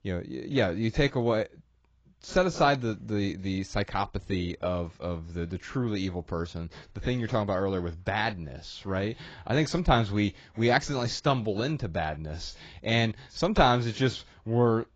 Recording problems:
garbled, watery; badly; nothing above 7.5 kHz

